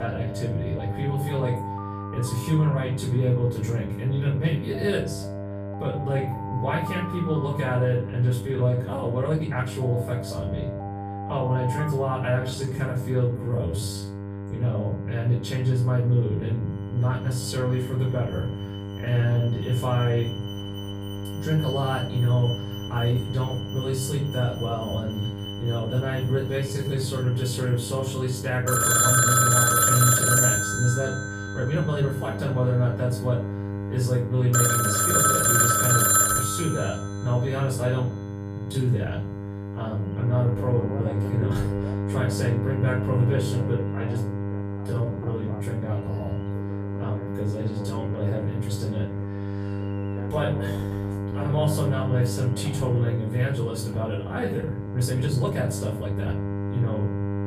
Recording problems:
off-mic speech; far
room echo; noticeable; dies away in 0.4 s
alarms or sirens; very loud; throughout; 3 dB above the speech
electrical hum; loud; throughout; 50 Hz, 7 dB below the speech
abrupt cut into speech; at the start
uneven, jittery; strongly; from 5.5 to 56 s

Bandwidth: 15 kHz